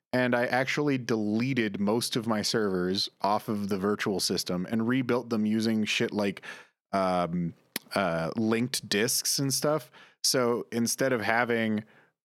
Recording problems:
none

